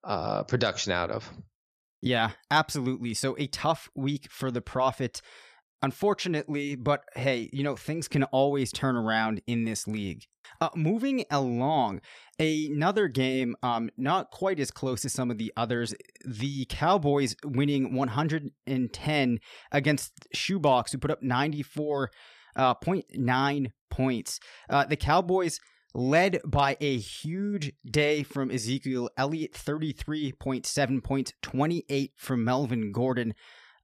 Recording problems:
none

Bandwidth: 14.5 kHz